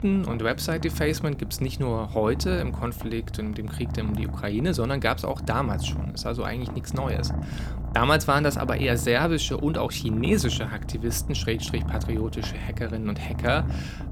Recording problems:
animal sounds; loud; throughout; 6 dB below the speech

